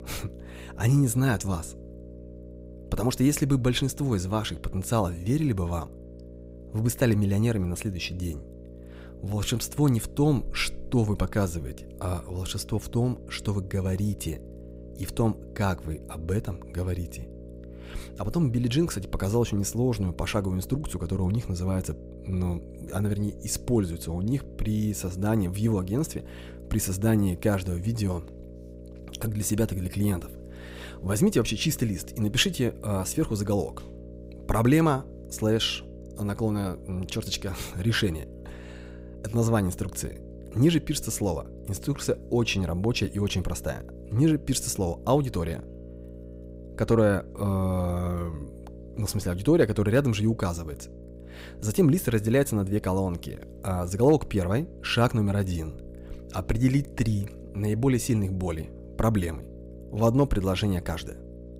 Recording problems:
electrical hum; noticeable; throughout; 60 Hz, 20 dB below the speech

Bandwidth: 15.5 kHz